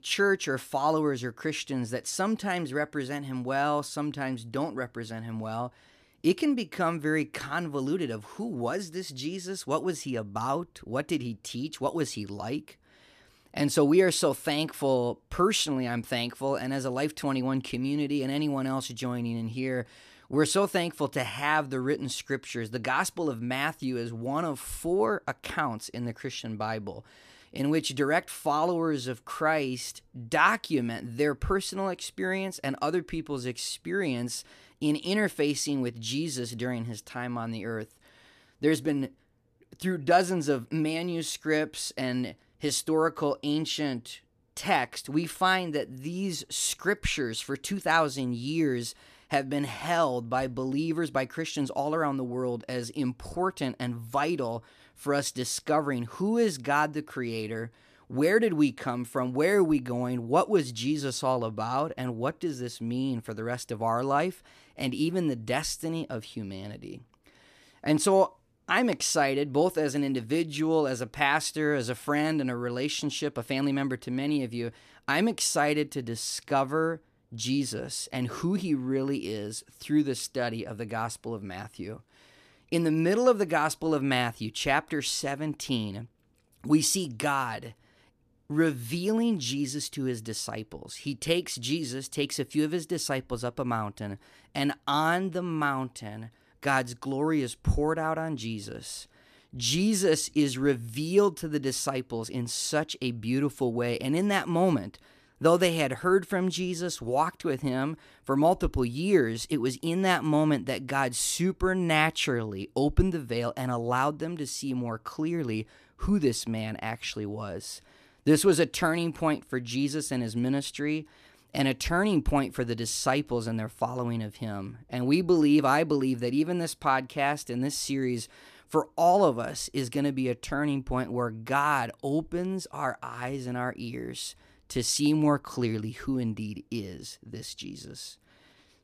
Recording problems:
none

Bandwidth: 14.5 kHz